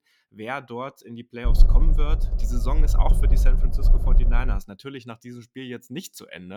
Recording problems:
low rumble; loud; from 1.5 to 4.5 s; 8 dB below the speech
abrupt cut into speech; at the end

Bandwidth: 18.5 kHz